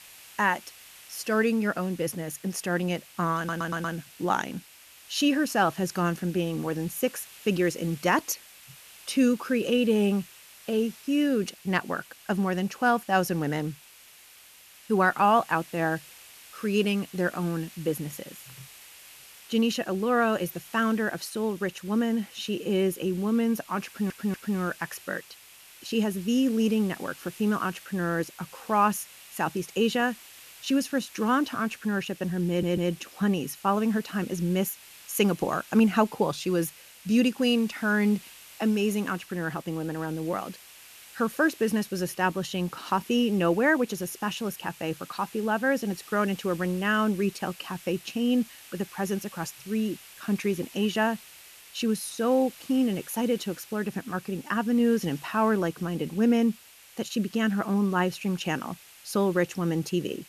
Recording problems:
hiss; noticeable; throughout; 20 dB below the speech
audio stuttering; at 3.5 s, at 24 s and at 32 s

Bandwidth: 14 kHz